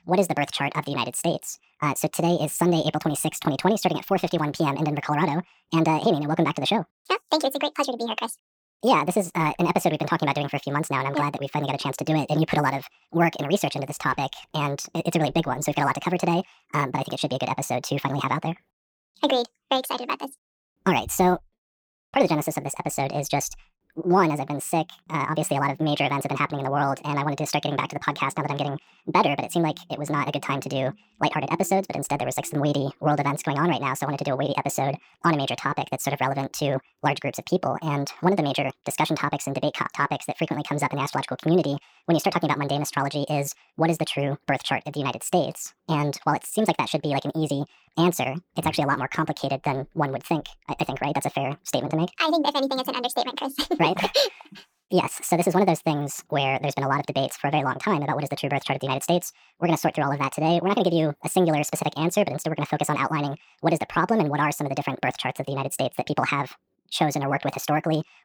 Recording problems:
wrong speed and pitch; too fast and too high; 1.6 times normal speed

